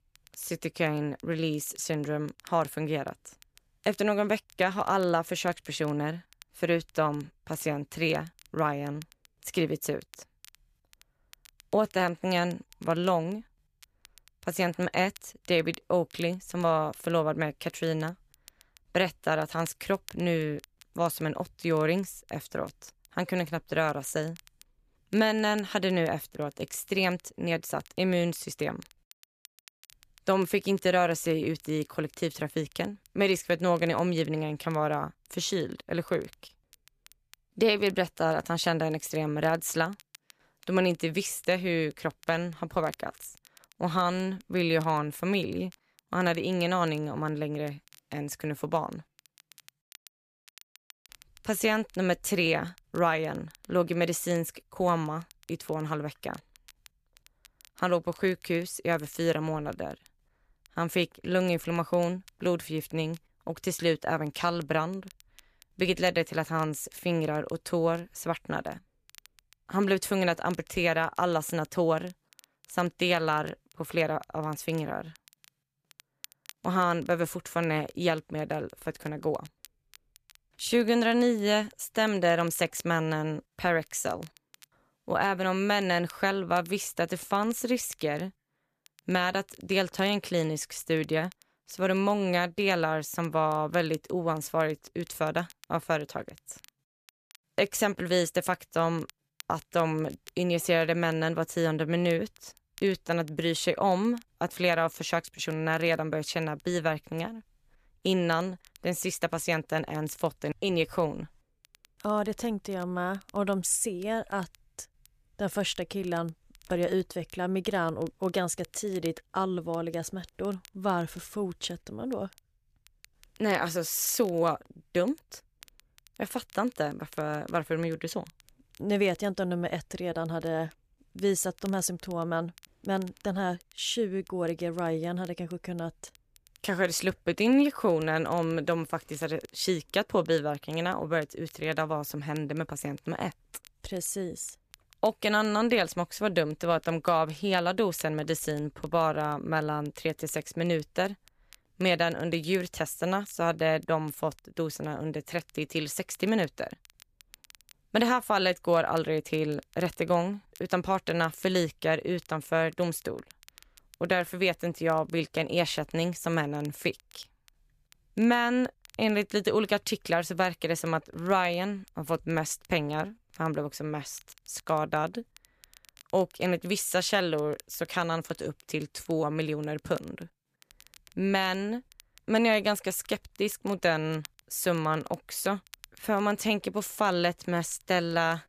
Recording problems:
crackle, like an old record; faint; 25 dB below the speech

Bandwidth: 14.5 kHz